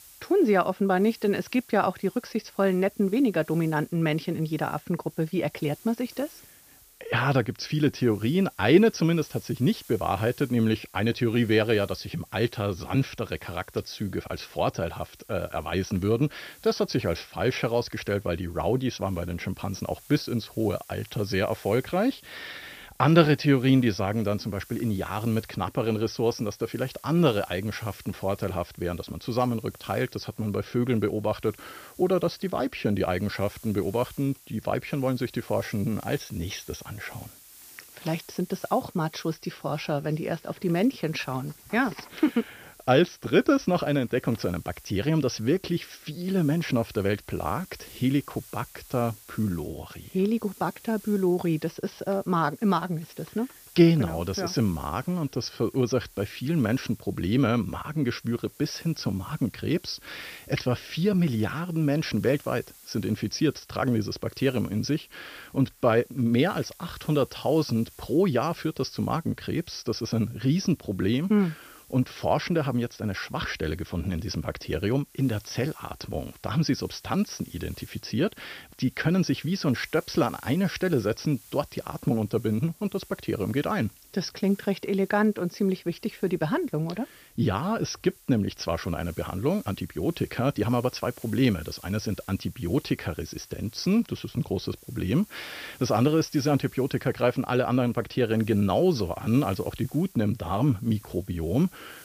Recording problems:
high frequencies cut off; noticeable; nothing above 6 kHz
hiss; faint; throughout; 25 dB below the speech

